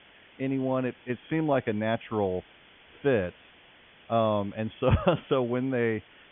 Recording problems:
high frequencies cut off; severe; nothing above 3.5 kHz
hiss; faint; throughout; 25 dB below the speech

